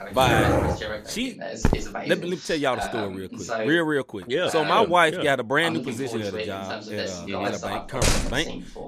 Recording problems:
voice in the background; loud; throughout; 8 dB below the speech
dog barking; loud; until 1 s; peak 4 dB above the speech
footsteps; noticeable; at 1.5 s; peak 1 dB below the speech
door banging; loud; at 8 s; peak 2 dB above the speech

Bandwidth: 14.5 kHz